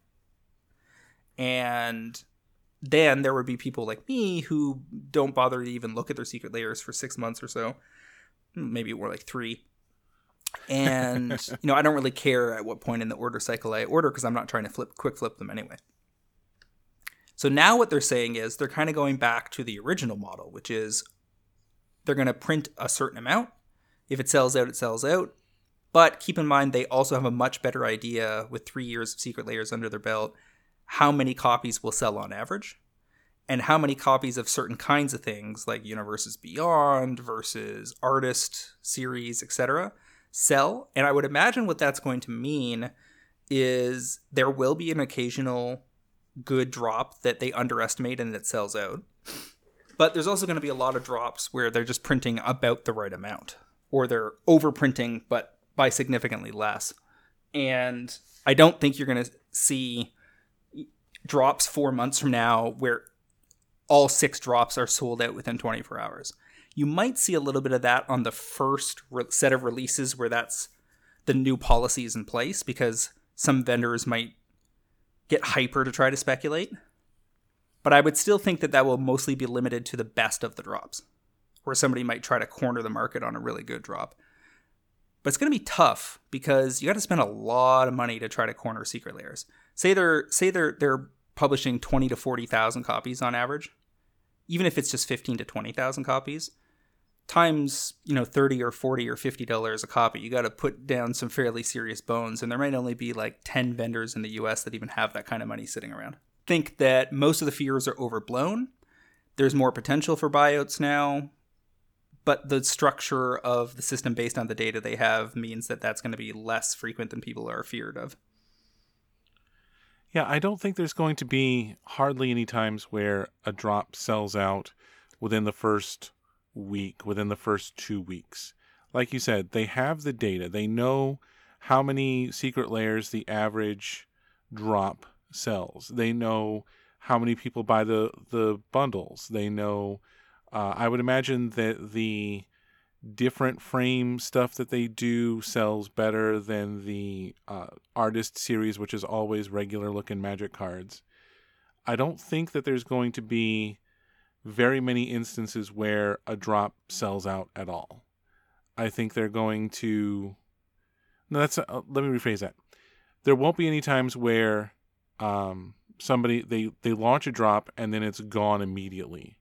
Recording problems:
none

